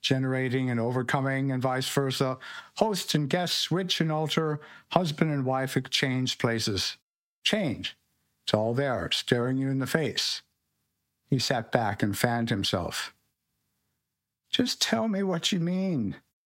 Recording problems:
squashed, flat; somewhat

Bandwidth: 16 kHz